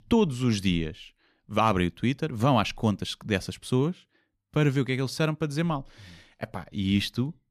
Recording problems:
none

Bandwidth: 14.5 kHz